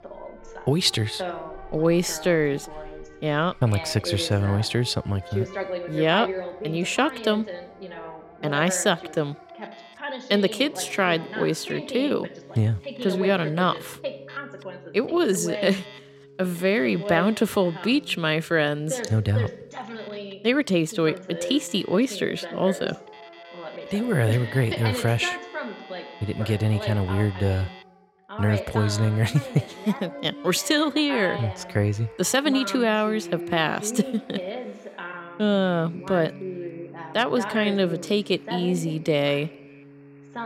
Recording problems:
voice in the background; noticeable; throughout; 10 dB below the speech
alarms or sirens; faint; throughout; 25 dB below the speech
background music; faint; throughout; 20 dB below the speech

